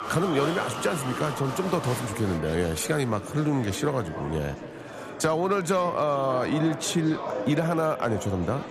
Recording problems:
murmuring crowd; loud; throughout; 8 dB below the speech

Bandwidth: 14 kHz